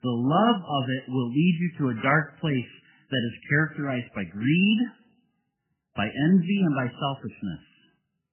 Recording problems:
garbled, watery; badly; nothing above 3 kHz

